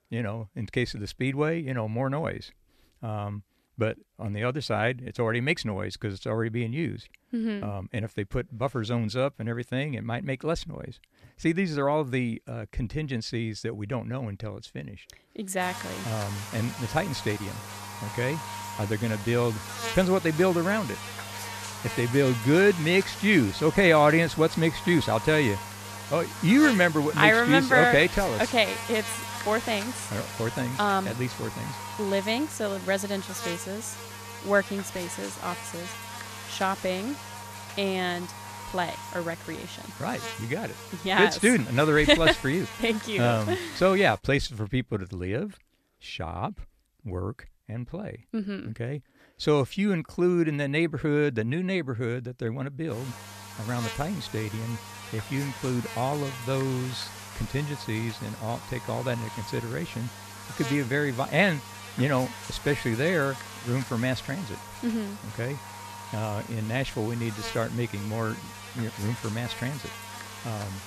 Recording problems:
electrical hum; loud; from 16 to 44 s and from 53 s on; 50 Hz, 10 dB below the speech

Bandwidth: 14.5 kHz